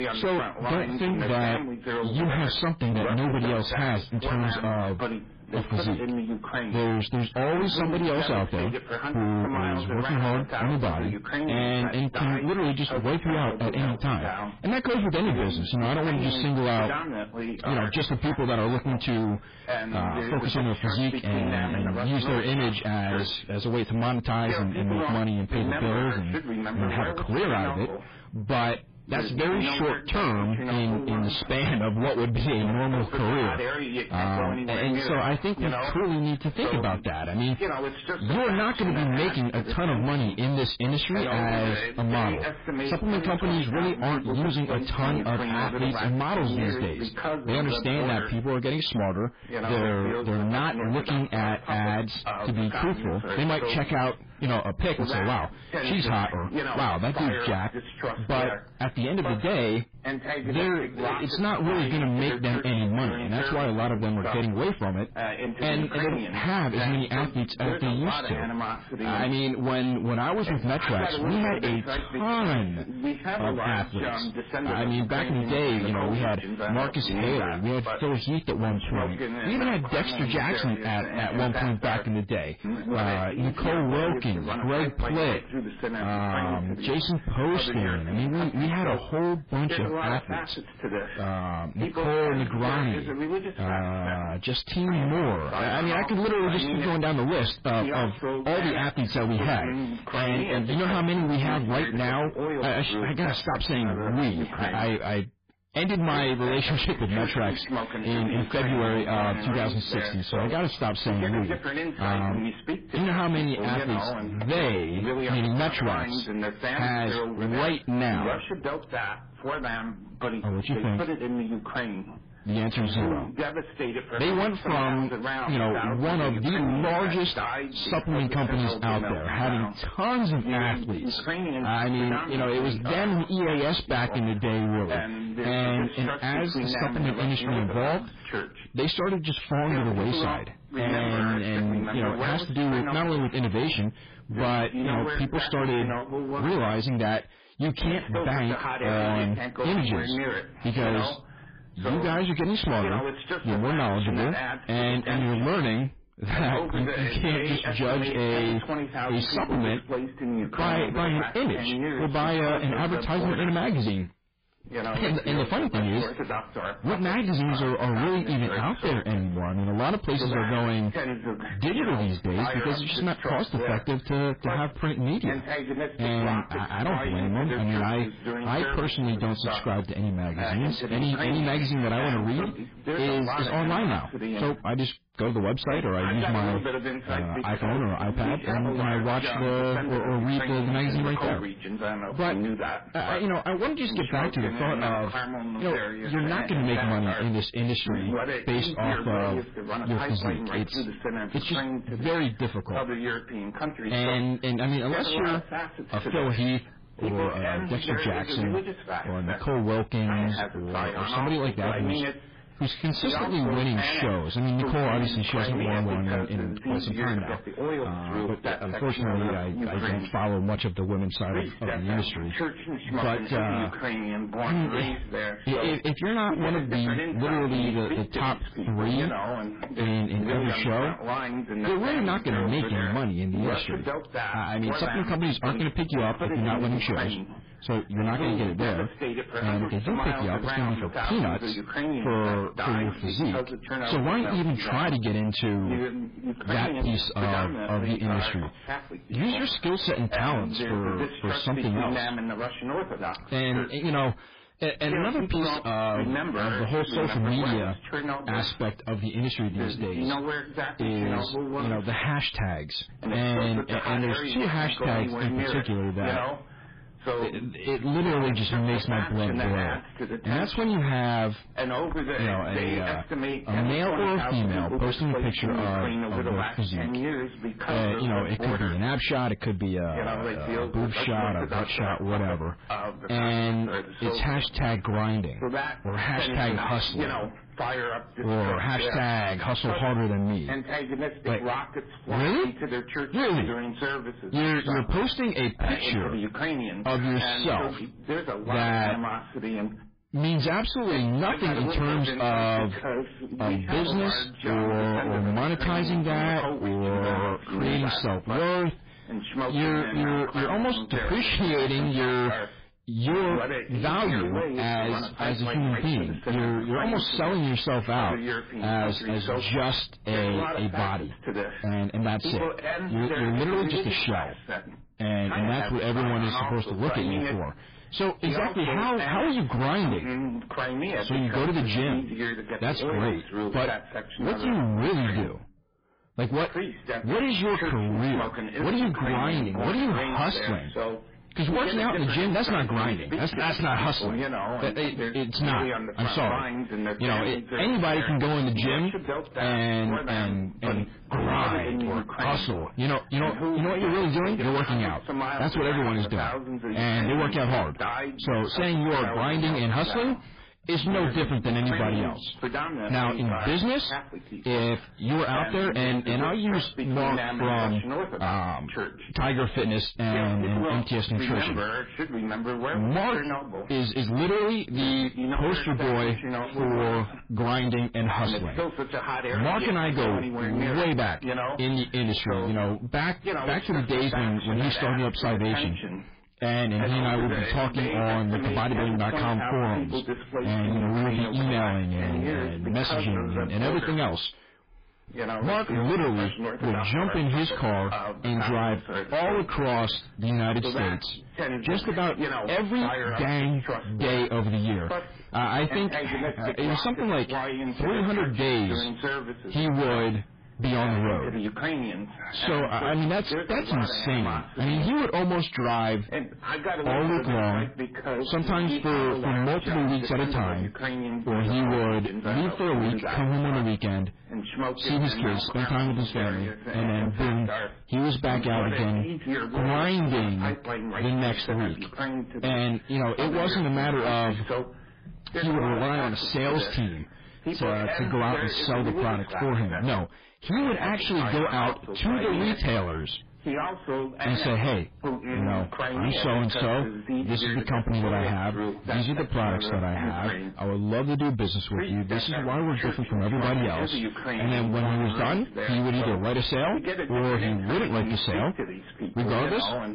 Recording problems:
distortion; heavy; 34% of the sound clipped
garbled, watery; badly
voice in the background; loud; throughout; 5 dB below the speech

